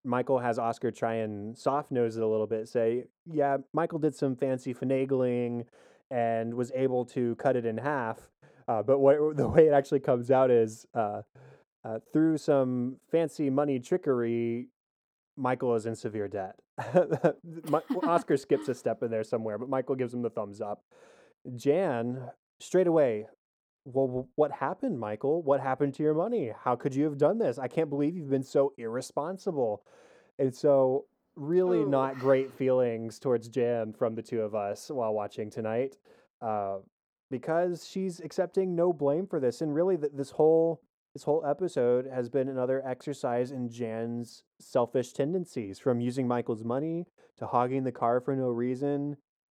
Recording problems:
muffled; very; fading above 2.5 kHz

